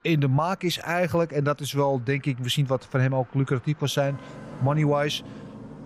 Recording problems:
traffic noise; noticeable; throughout; 20 dB below the speech

